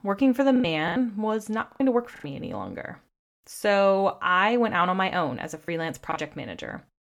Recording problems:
choppy; very; 6% of the speech affected

